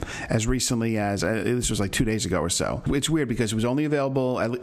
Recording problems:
squashed, flat; somewhat

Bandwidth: 14 kHz